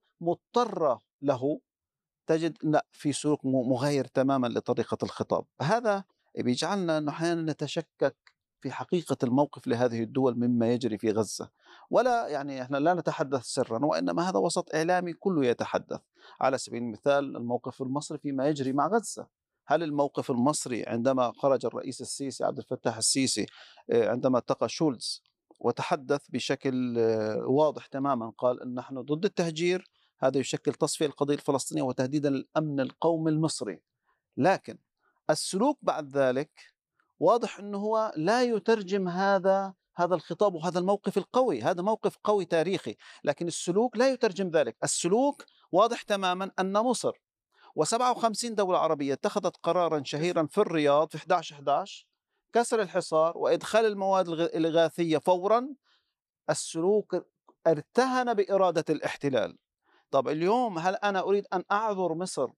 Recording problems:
none

